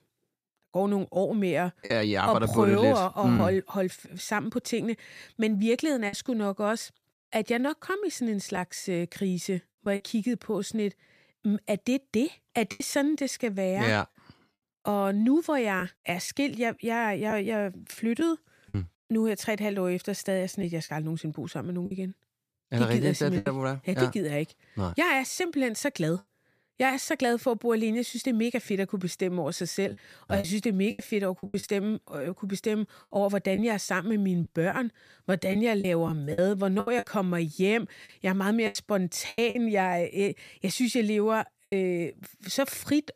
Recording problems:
choppy; occasionally; 4% of the speech affected

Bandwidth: 14.5 kHz